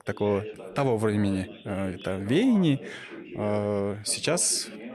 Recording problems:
background chatter; noticeable; throughout; 2 voices, 15 dB below the speech

